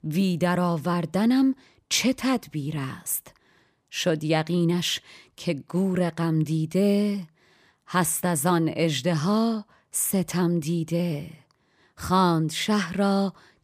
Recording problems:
none

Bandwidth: 15 kHz